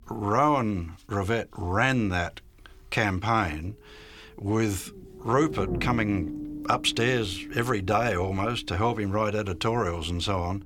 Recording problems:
low rumble; noticeable; throughout; 15 dB below the speech

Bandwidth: 18.5 kHz